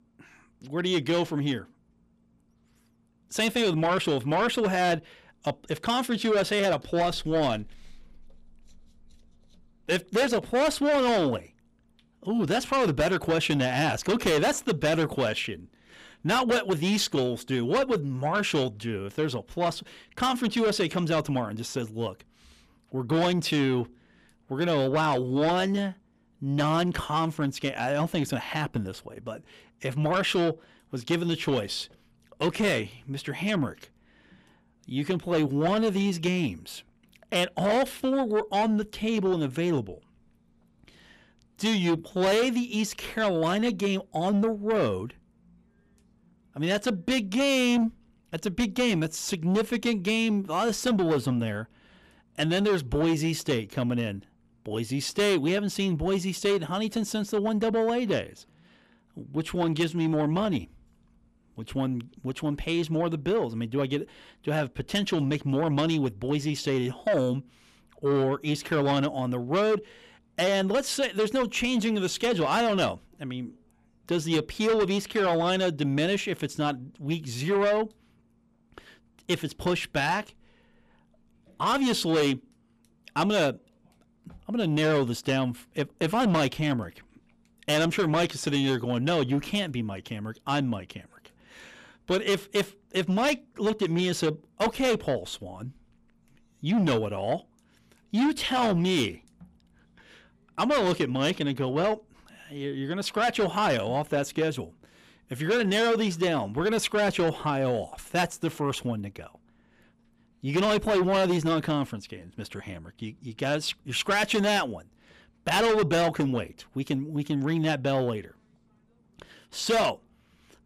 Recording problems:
distortion; heavy; 8 dB below the speech

